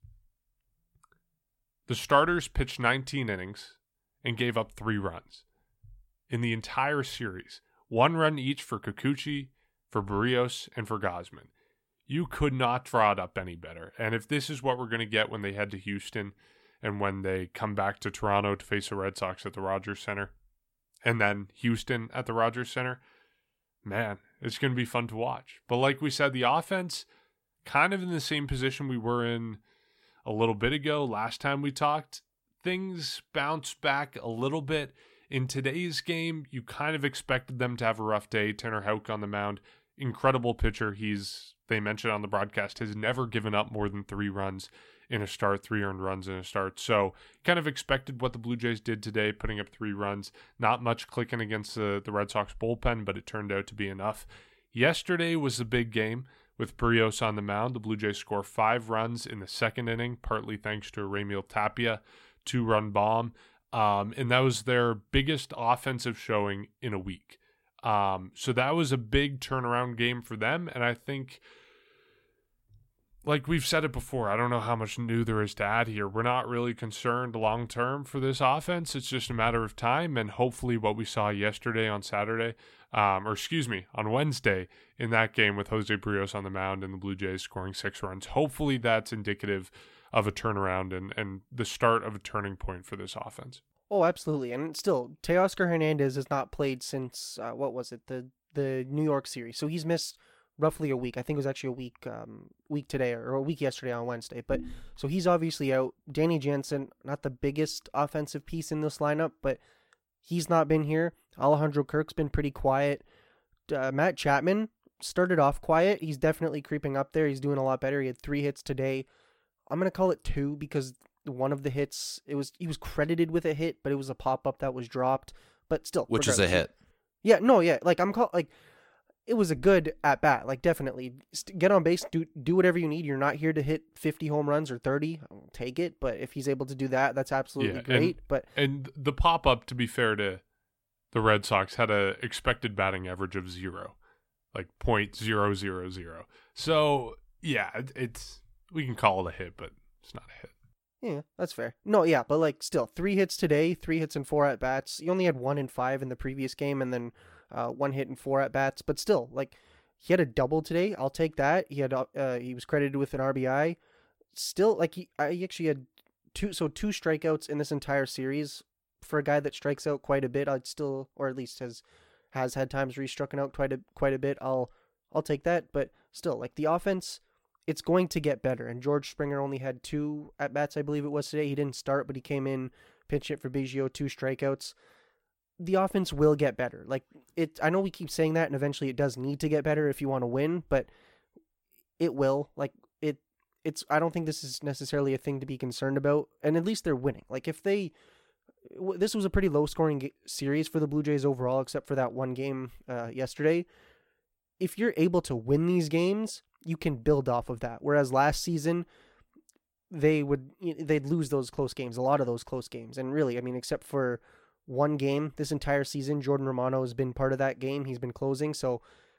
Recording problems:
none

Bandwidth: 16.5 kHz